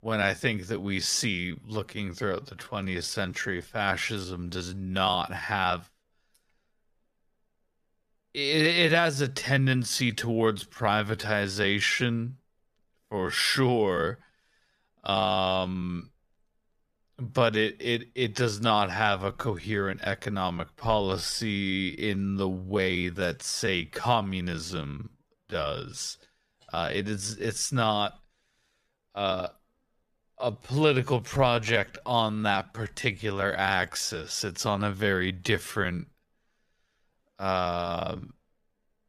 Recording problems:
wrong speed, natural pitch; too slow; 0.6 times normal speed

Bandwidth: 14.5 kHz